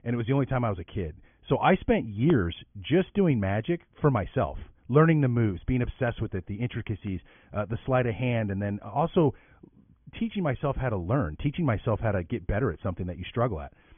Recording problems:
high frequencies cut off; severe; nothing above 3.5 kHz

